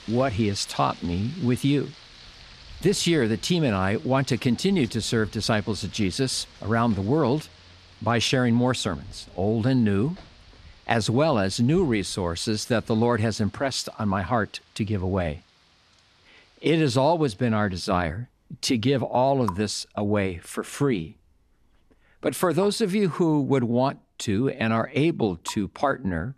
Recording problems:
rain or running water; faint; throughout; 20 dB below the speech

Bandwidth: 13.5 kHz